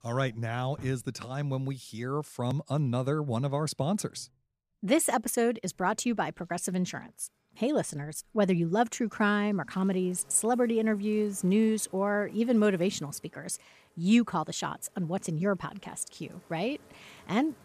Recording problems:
household noises; faint; throughout; 30 dB below the speech

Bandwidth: 14.5 kHz